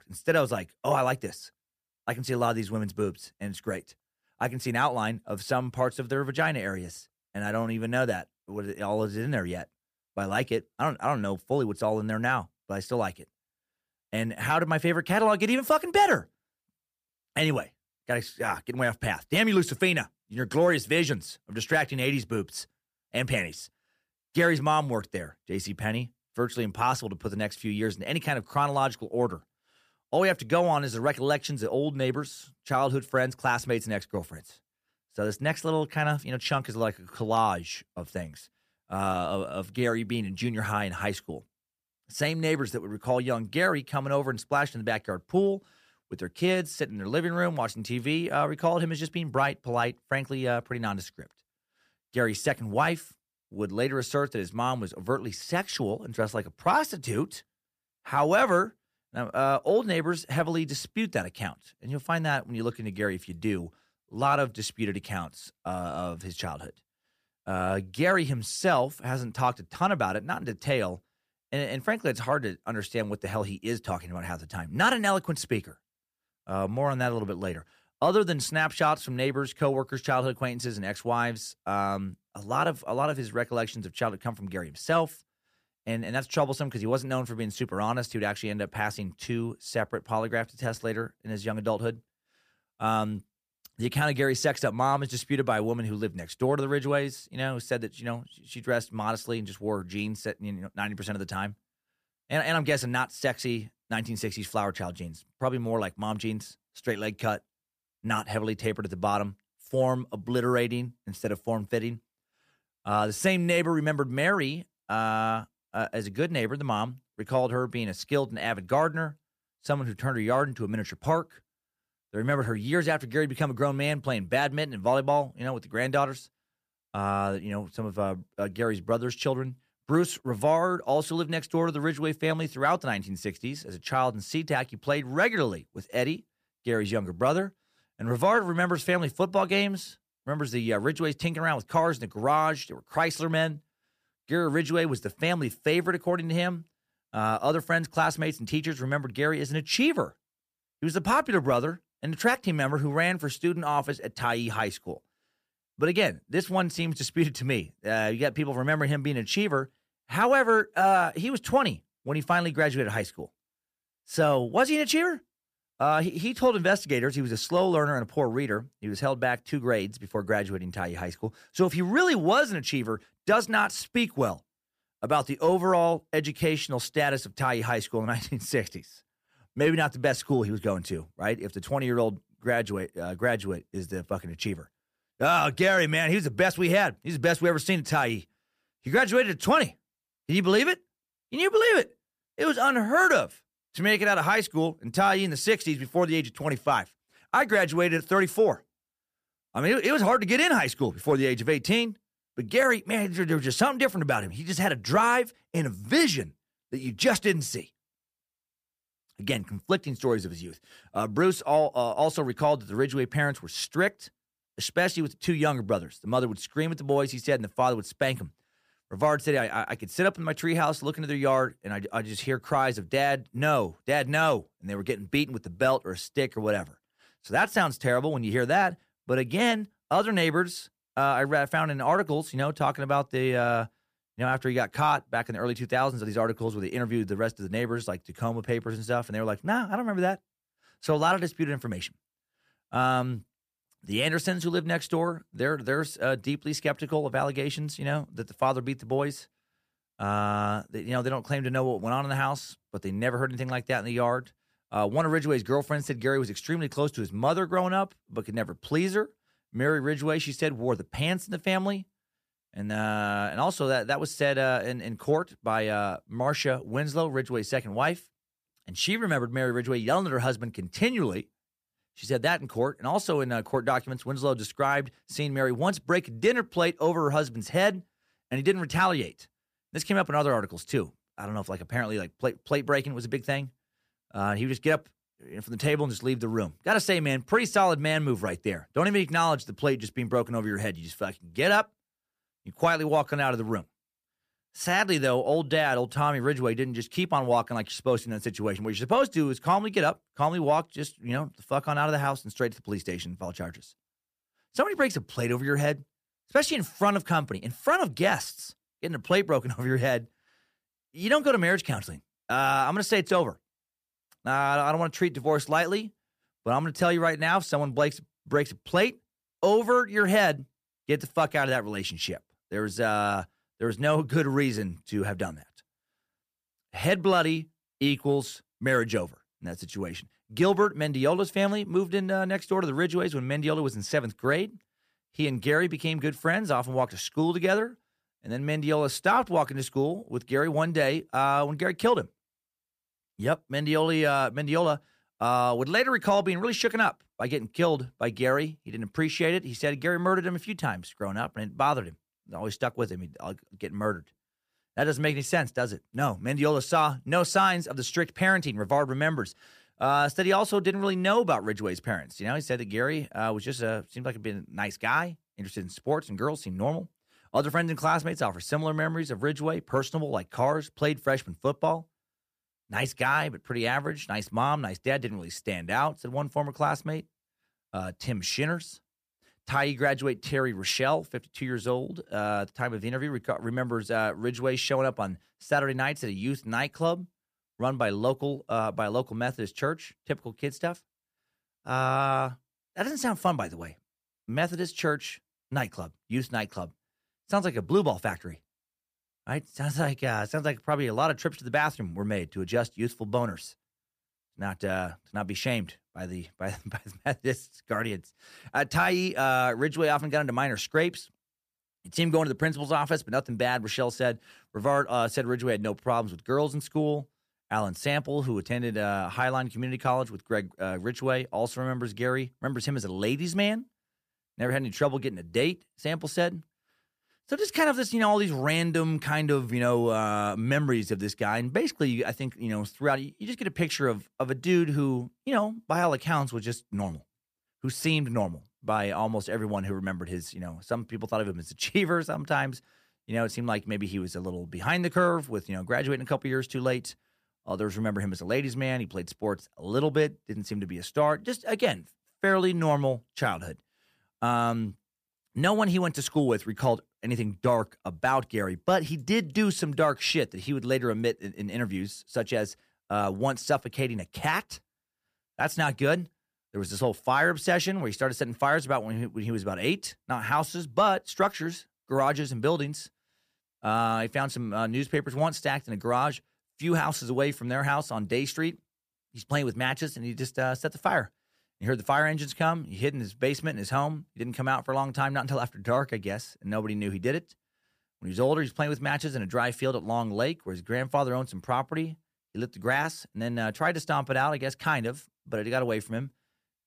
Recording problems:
none

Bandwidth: 15 kHz